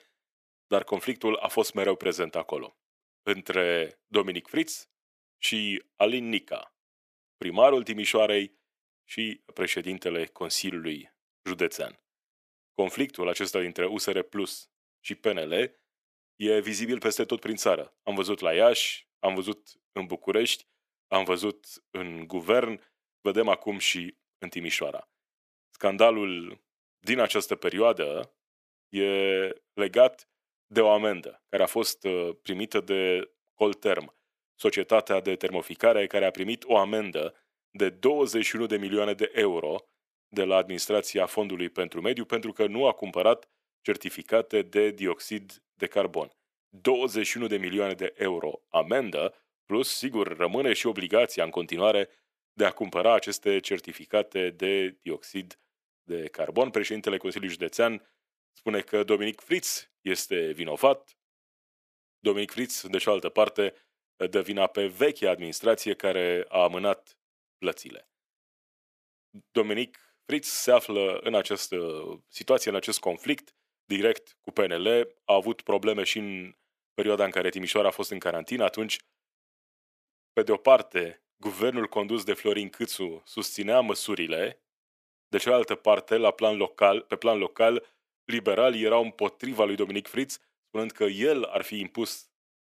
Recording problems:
thin; very; fading below 350 Hz

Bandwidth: 14.5 kHz